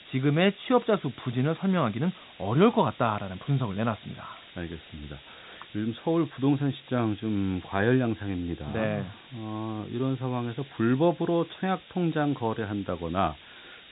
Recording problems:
high frequencies cut off; severe; nothing above 4 kHz
hiss; faint; throughout; 20 dB below the speech

